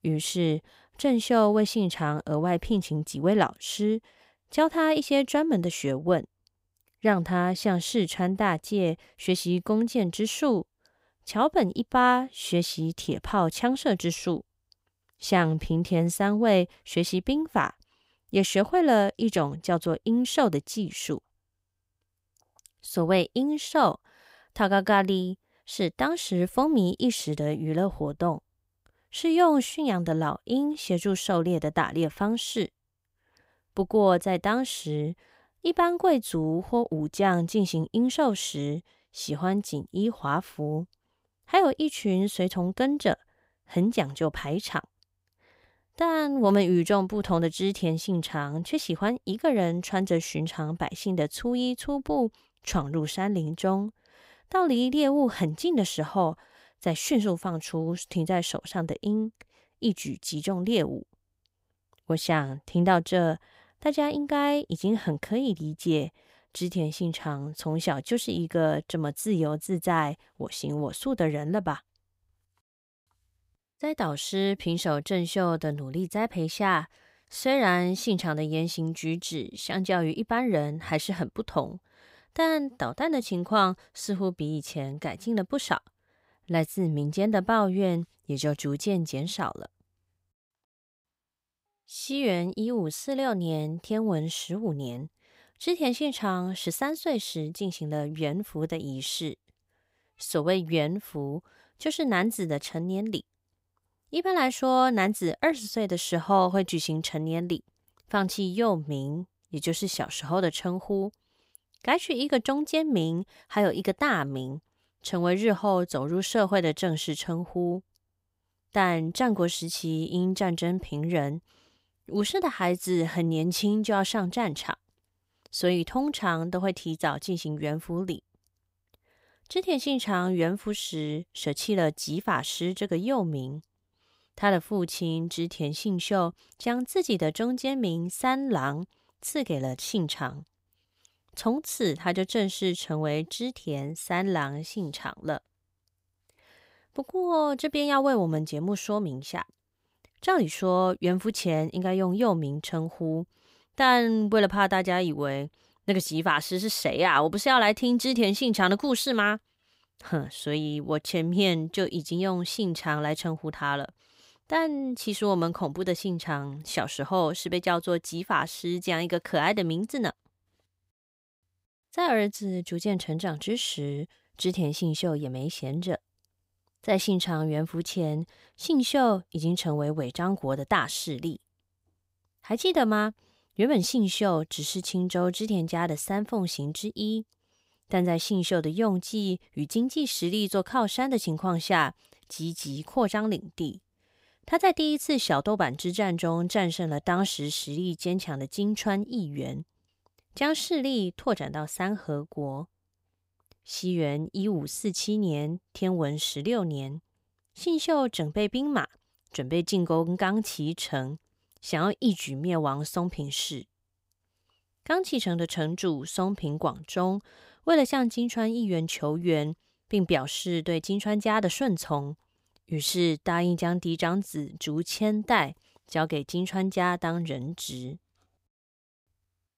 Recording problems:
none

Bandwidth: 15.5 kHz